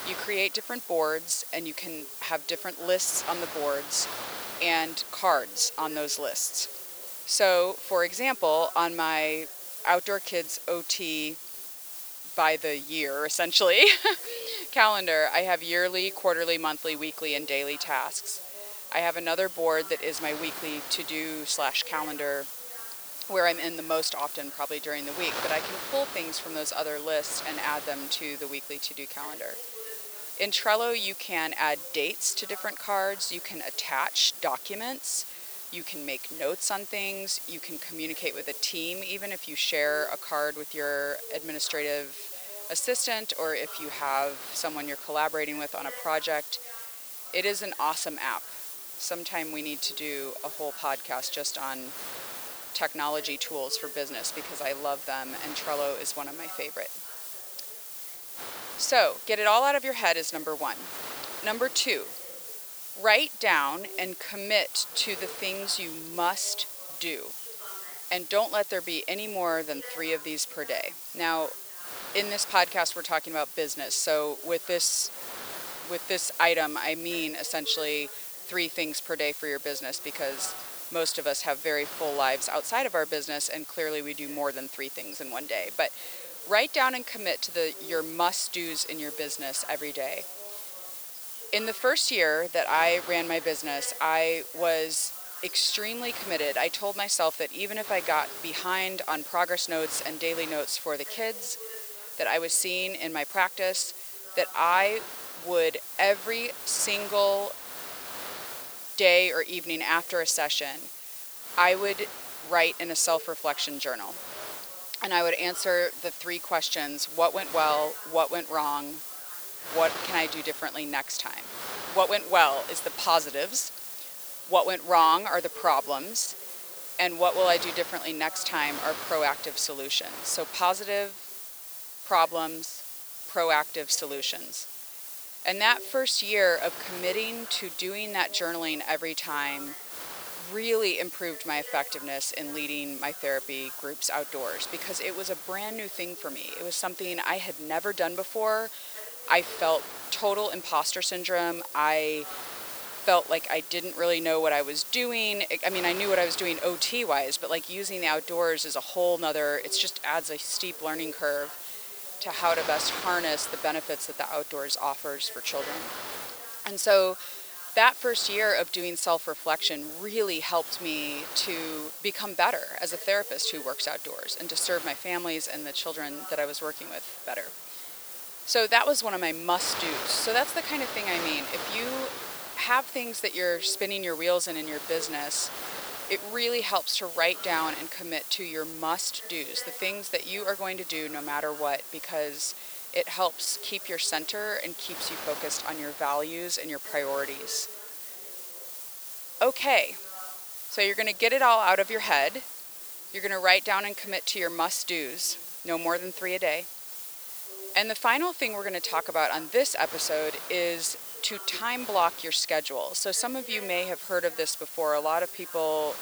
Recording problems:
thin; somewhat; fading below 550 Hz
hiss; loud; throughout; 10 dB below the speech
wind noise on the microphone; occasional gusts; 15 dB below the speech
voice in the background; faint; throughout; 25 dB below the speech

